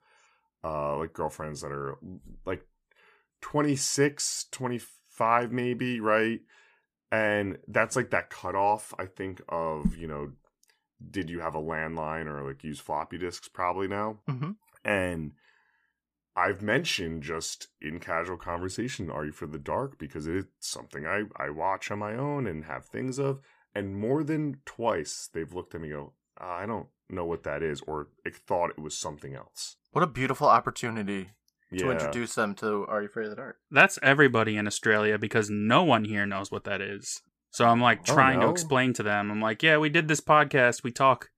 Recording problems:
none

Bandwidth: 14.5 kHz